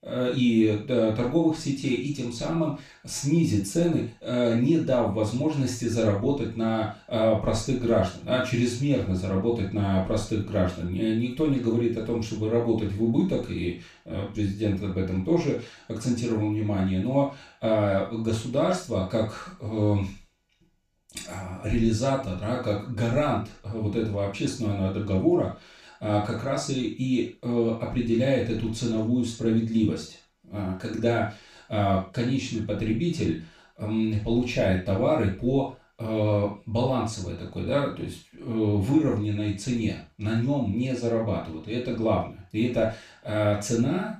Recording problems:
off-mic speech; far
room echo; noticeable; dies away in 0.3 s

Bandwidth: 14.5 kHz